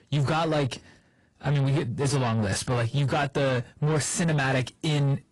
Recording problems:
distortion; slight; 10 dB below the speech
garbled, watery; slightly; nothing above 10.5 kHz

